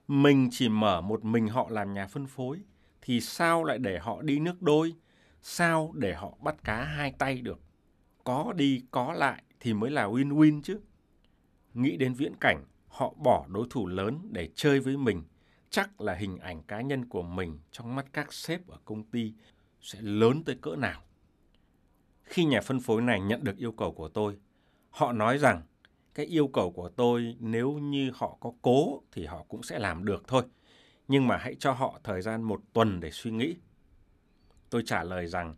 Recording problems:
none

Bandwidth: 13.5 kHz